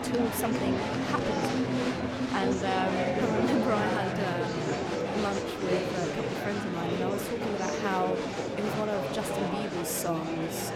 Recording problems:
murmuring crowd; very loud; throughout; 2 dB above the speech

